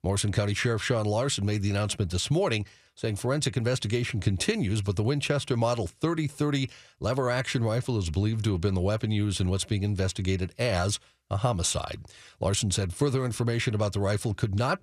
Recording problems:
none

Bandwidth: 14 kHz